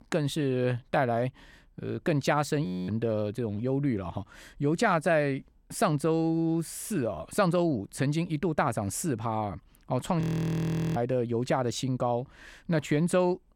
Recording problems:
audio freezing; at 2.5 s and at 10 s for 1 s

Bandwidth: 17 kHz